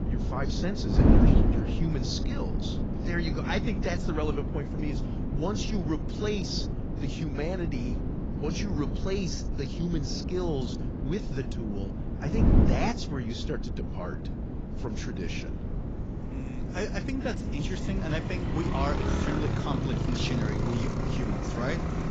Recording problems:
garbled, watery; badly
traffic noise; very loud; throughout; as loud as the speech
wind noise on the microphone; heavy; 3 dB below the speech

